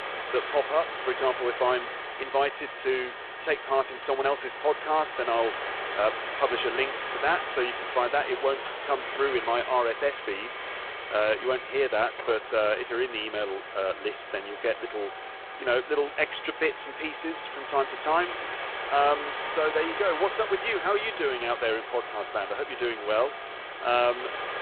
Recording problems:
phone-call audio; poor line
hiss; loud; throughout; 7 dB below the speech
background music; noticeable; throughout; 20 dB below the speech

